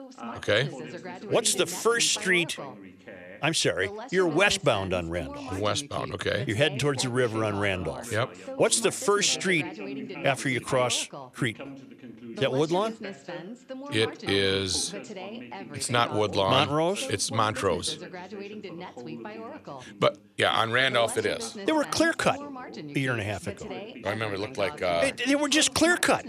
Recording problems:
background chatter; noticeable; throughout; 2 voices, 15 dB below the speech

